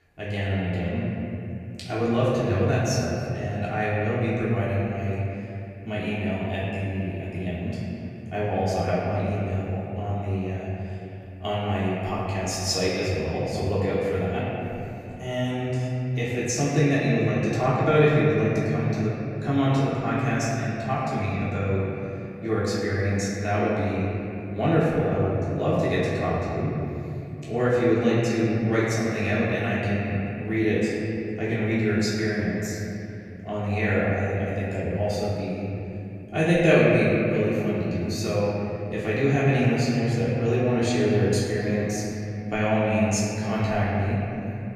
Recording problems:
room echo; strong; dies away in 3 s
off-mic speech; far

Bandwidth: 14.5 kHz